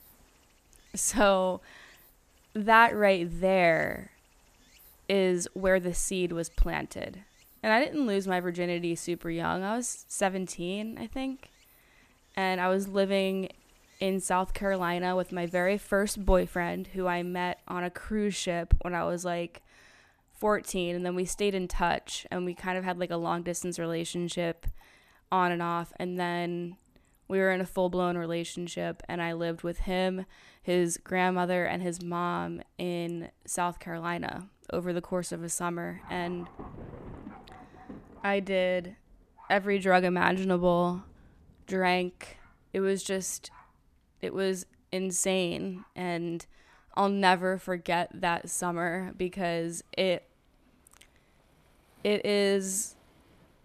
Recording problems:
rain or running water; faint; throughout; 25 dB below the speech

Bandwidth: 14.5 kHz